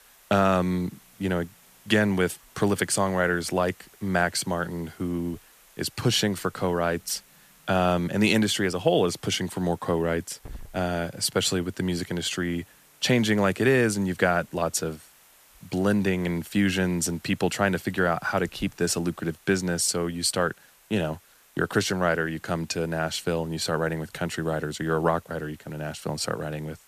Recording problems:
hiss; faint; throughout; 25 dB below the speech

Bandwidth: 14.5 kHz